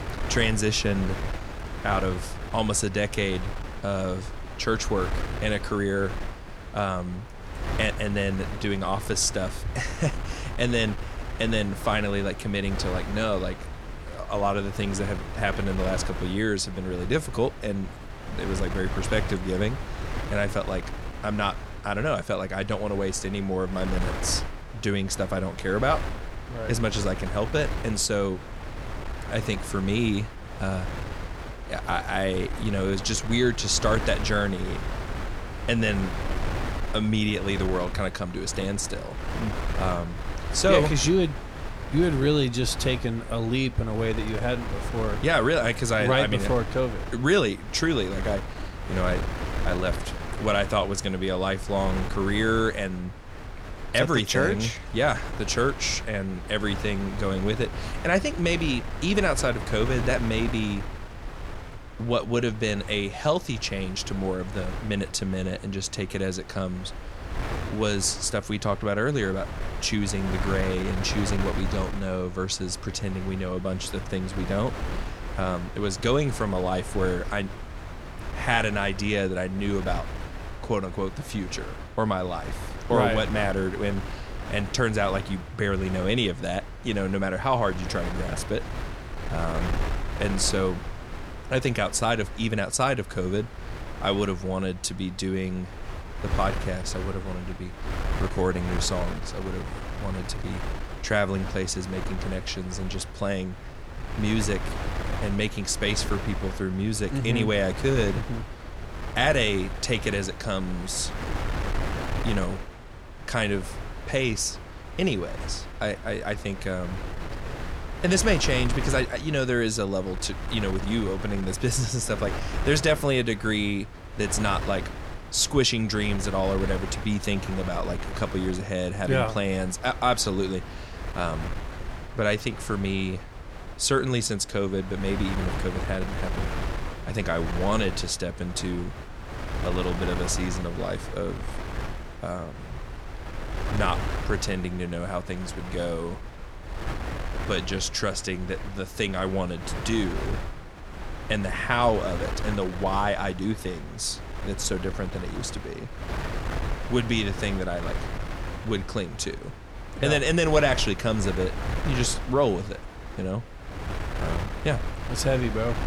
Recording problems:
wind noise on the microphone; heavy; 10 dB below the speech

